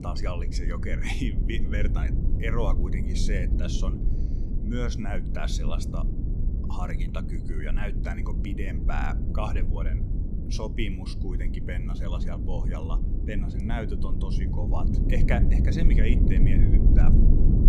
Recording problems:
low rumble; loud; throughout; 3 dB below the speech

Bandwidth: 14 kHz